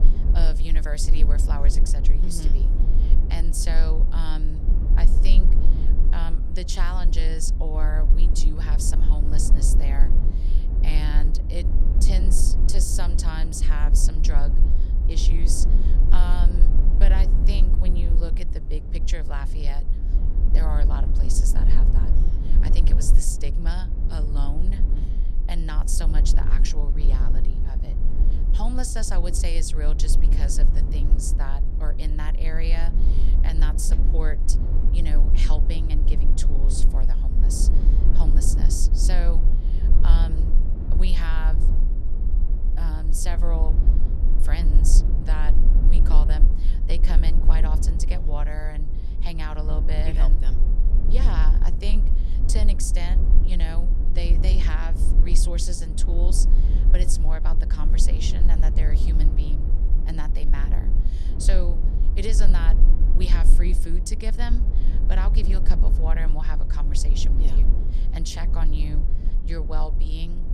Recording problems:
low rumble; loud; throughout; 6 dB below the speech

